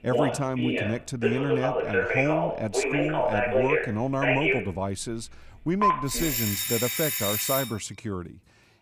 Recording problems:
alarms or sirens; very loud; throughout; 3 dB above the speech

